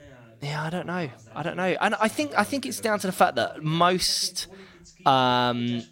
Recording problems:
voice in the background; faint; throughout; 25 dB below the speech

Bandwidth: 16 kHz